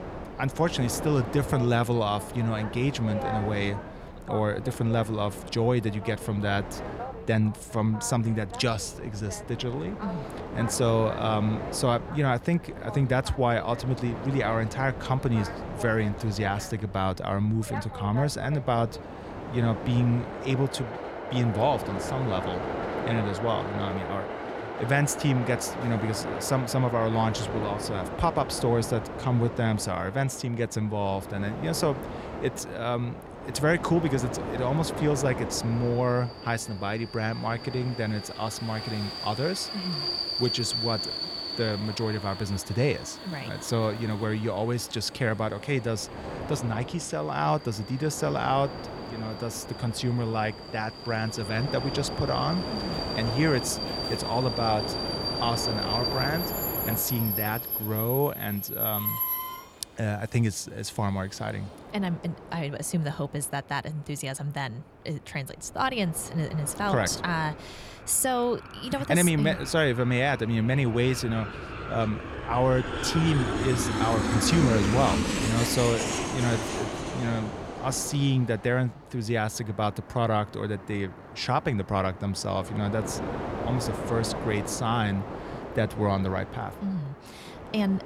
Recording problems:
train or aircraft noise; loud; throughout; 5 dB below the speech

